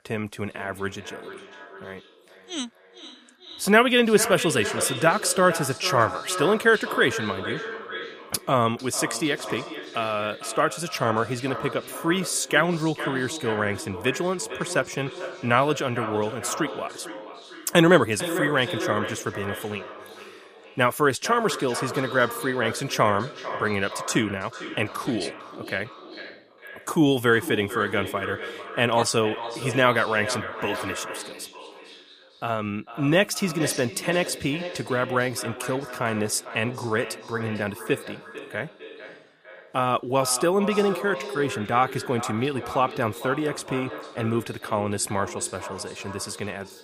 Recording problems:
echo of what is said; strong; throughout; 450 ms later, 10 dB below the speech

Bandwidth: 15 kHz